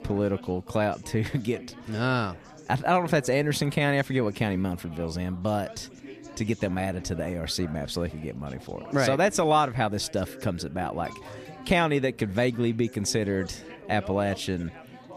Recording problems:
background chatter; noticeable; throughout; 4 voices, 20 dB below the speech
alarm; faint; at 11 s; peak 20 dB below the speech

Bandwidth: 14.5 kHz